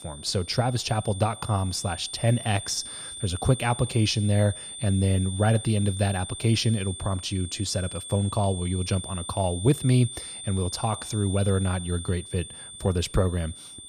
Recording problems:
high-pitched whine; noticeable; throughout; 9 kHz, 10 dB below the speech

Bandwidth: 15 kHz